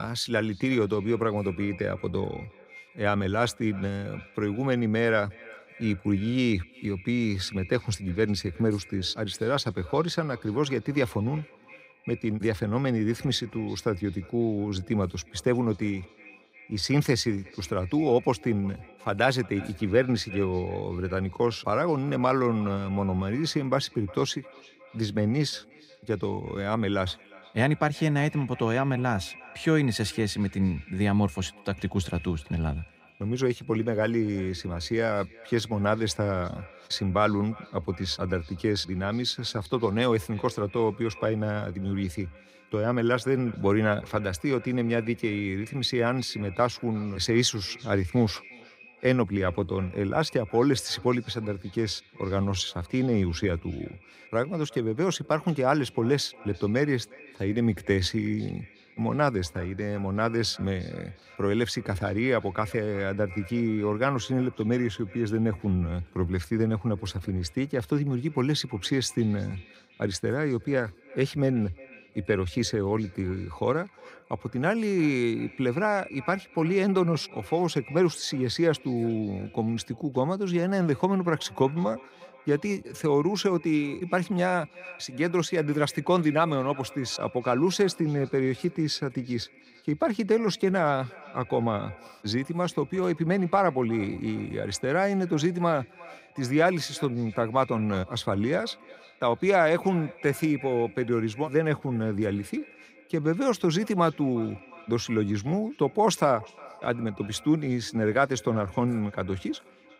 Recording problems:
echo of what is said; faint; throughout; 360 ms later, 20 dB below the speech
abrupt cut into speech; at the start

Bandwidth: 15.5 kHz